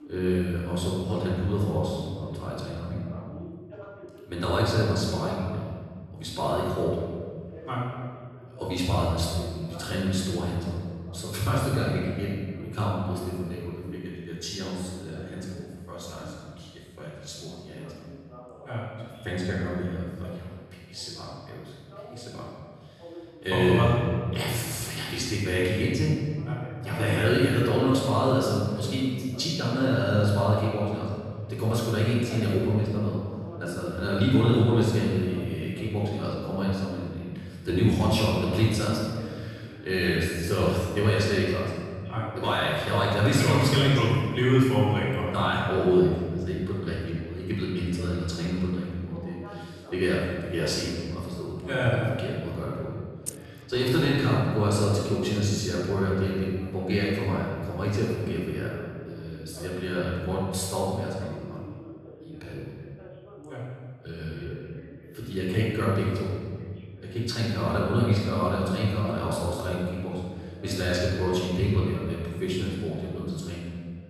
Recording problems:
room echo; strong; dies away in 1.7 s
off-mic speech; far
voice in the background; noticeable; throughout; 20 dB below the speech
jangling keys; very faint; at 53 s; peak 10 dB below the speech

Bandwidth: 13.5 kHz